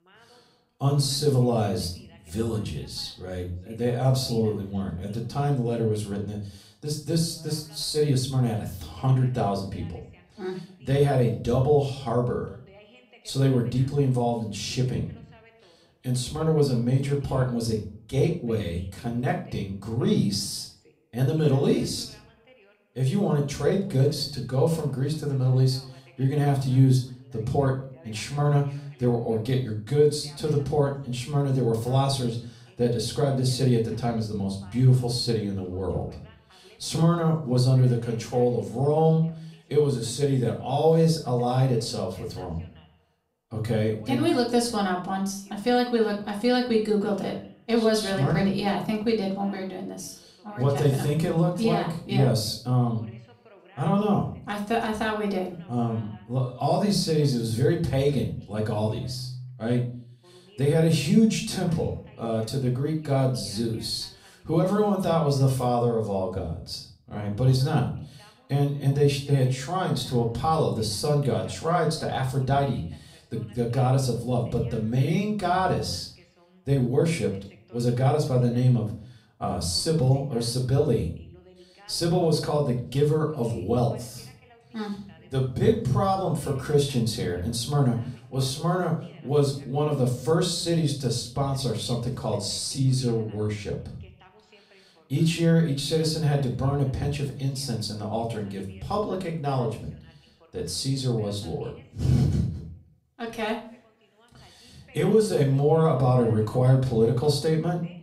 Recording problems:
off-mic speech; far
room echo; slight; dies away in 0.4 s
voice in the background; faint; throughout; 30 dB below the speech

